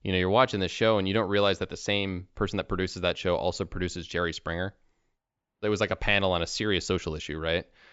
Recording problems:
high frequencies cut off; noticeable; nothing above 8 kHz

